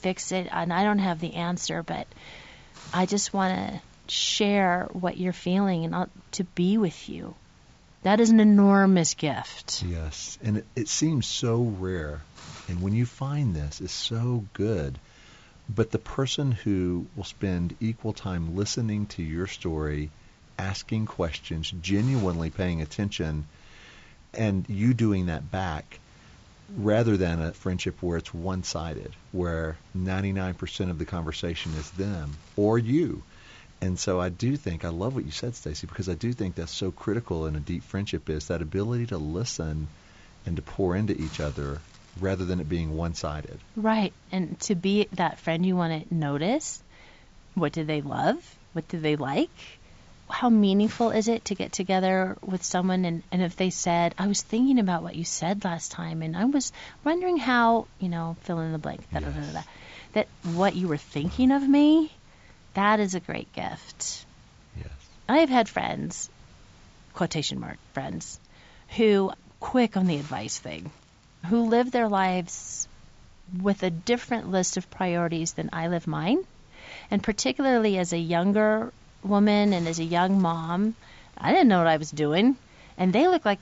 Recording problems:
high frequencies cut off; noticeable; nothing above 7.5 kHz
hiss; faint; throughout; 25 dB below the speech

